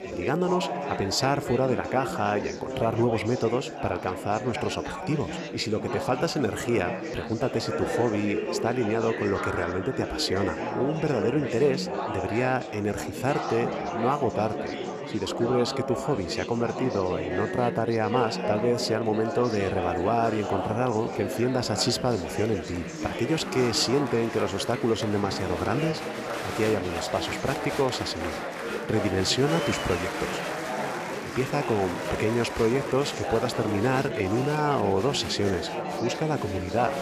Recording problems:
chatter from many people; loud; throughout; 4 dB below the speech

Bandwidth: 14.5 kHz